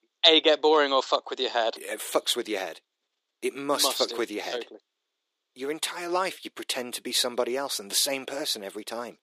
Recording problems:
thin; somewhat; fading below 350 Hz

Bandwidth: 15 kHz